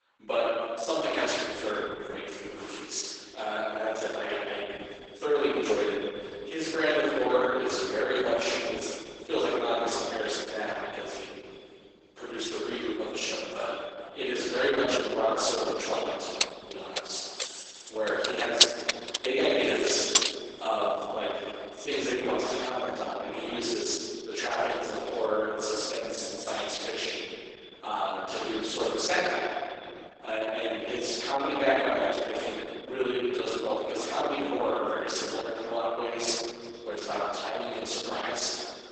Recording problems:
room echo; strong; dies away in 2.1 s
off-mic speech; far
garbled, watery; badly; nothing above 8 kHz
thin; somewhat; fading below 350 Hz
echo of what is said; faint; throughout; 180 ms later, 20 dB below the speech
jangling keys; loud; from 16 to 20 s; peak 6 dB above the speech

